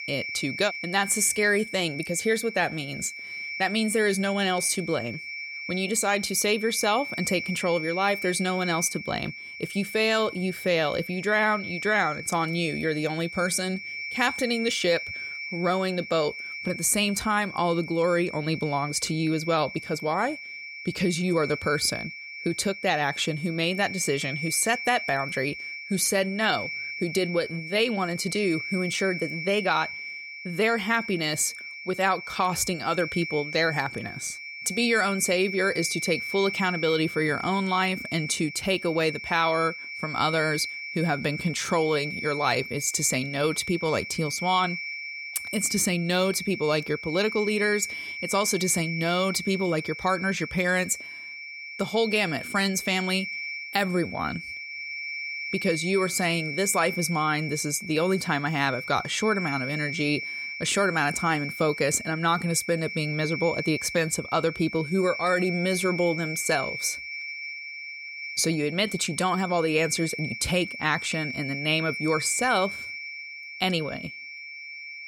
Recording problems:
high-pitched whine; loud; throughout; 2.5 kHz, 8 dB below the speech

